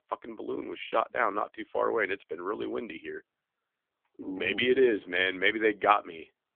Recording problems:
phone-call audio; poor line; nothing above 3.5 kHz

